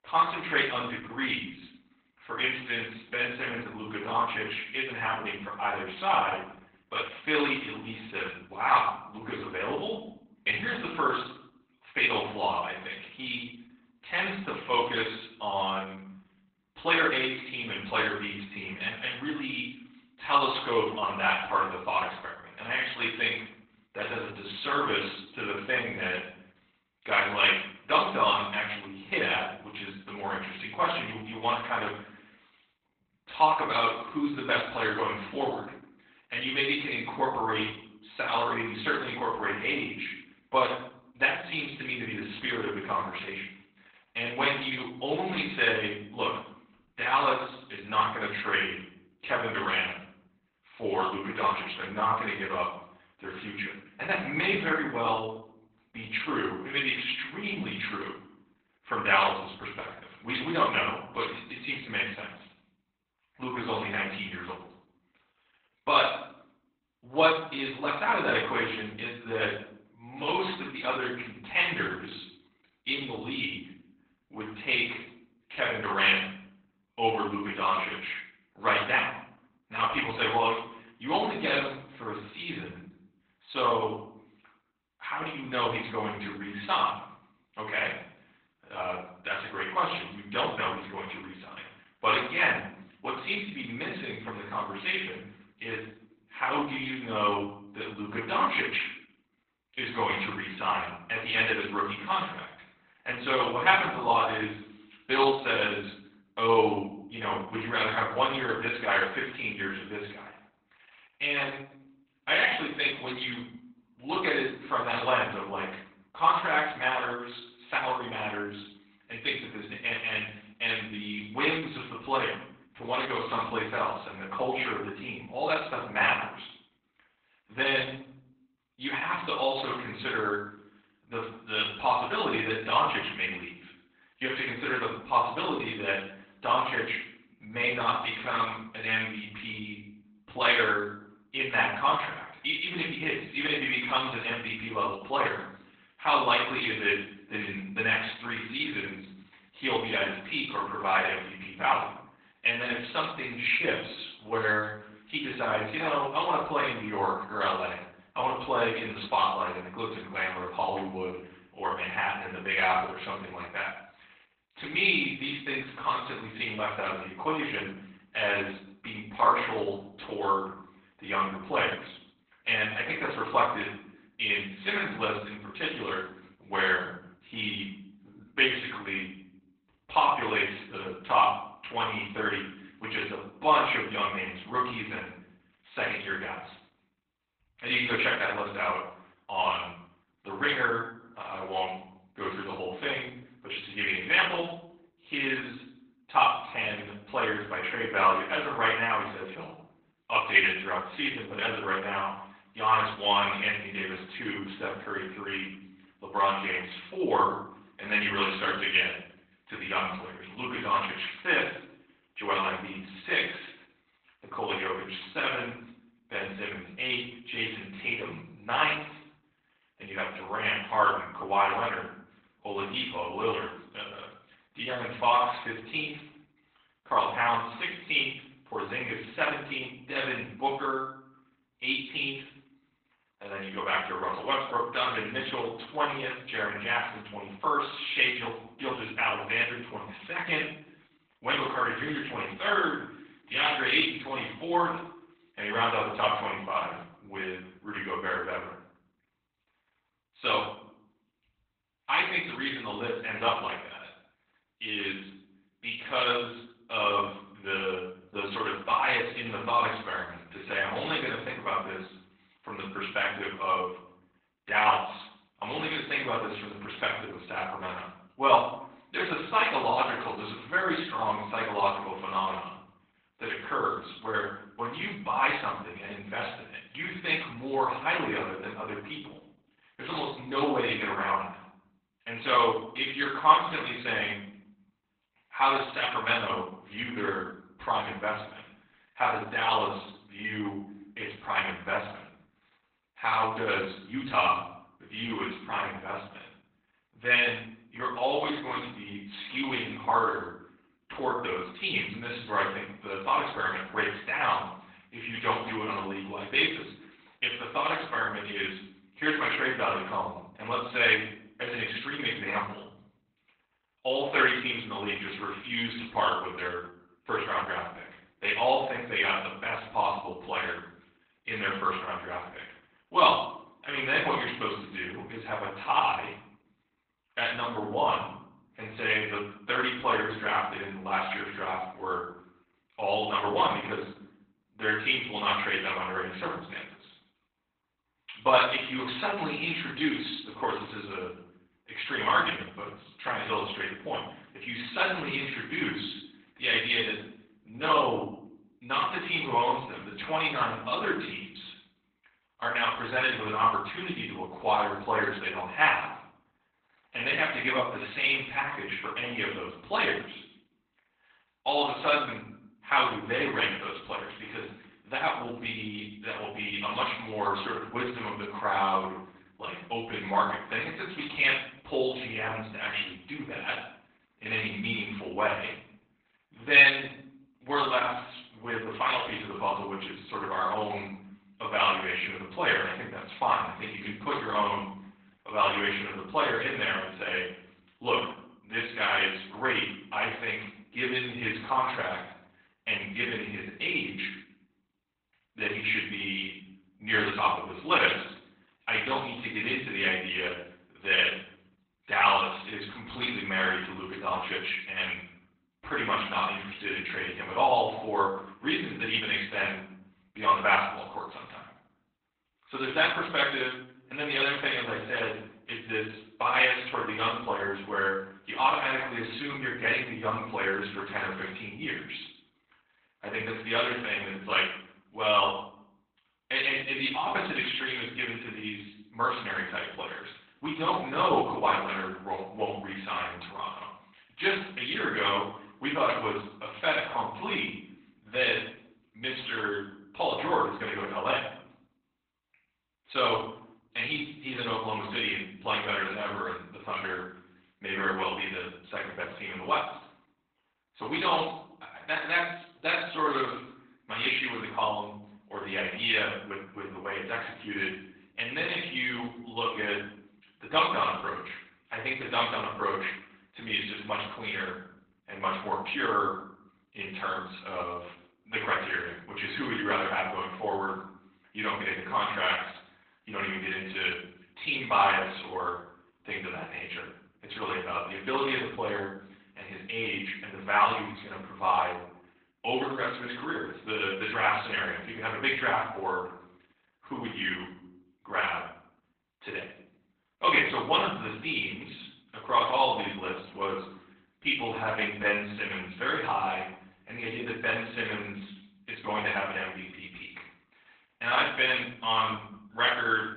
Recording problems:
off-mic speech; far
garbled, watery; badly; nothing above 3.5 kHz
room echo; noticeable; dies away in 0.6 s
thin; somewhat; fading below 600 Hz

